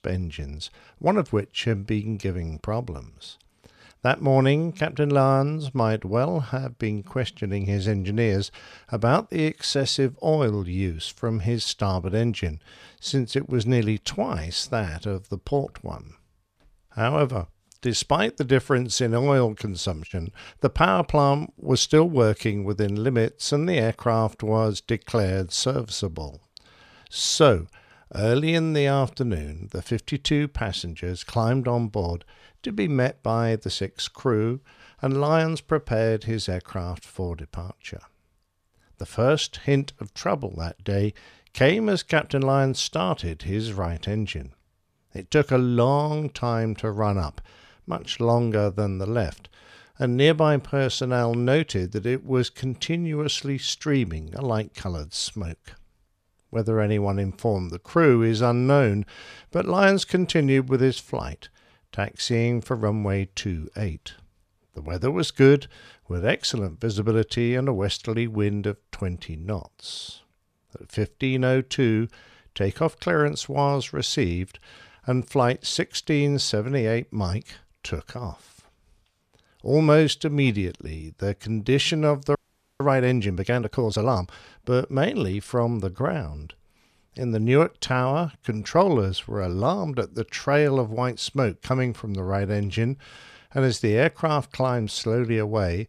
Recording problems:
audio freezing; at 1:22

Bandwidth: 14 kHz